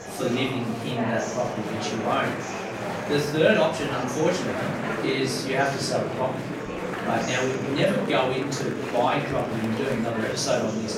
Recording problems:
off-mic speech; far
room echo; noticeable; dies away in 0.5 s
murmuring crowd; loud; throughout; 5 dB below the speech
background music; faint; throughout; 20 dB below the speech

